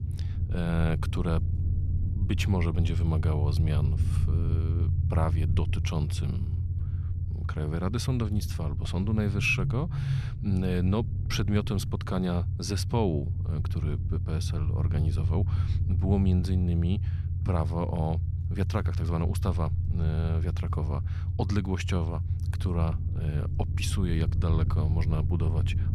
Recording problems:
low rumble; loud; throughout; 9 dB below the speech

